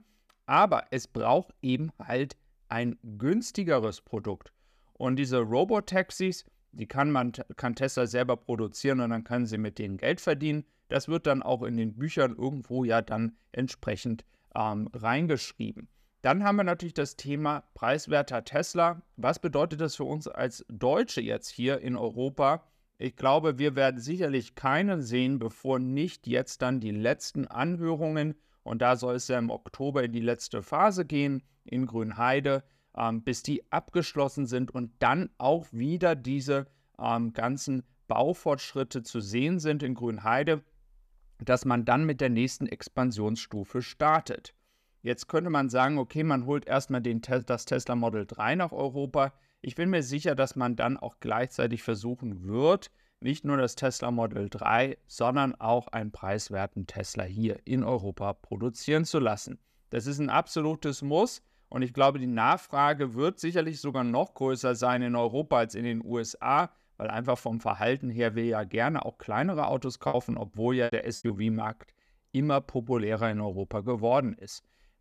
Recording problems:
choppy; very; from 1:10 to 1:11; 9% of the speech affected

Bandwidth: 14.5 kHz